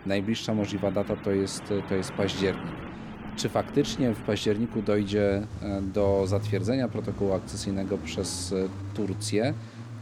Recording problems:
traffic noise; loud; throughout; 9 dB below the speech

